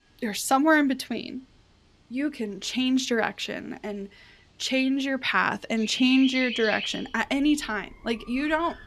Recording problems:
animal sounds; loud; throughout; 9 dB below the speech

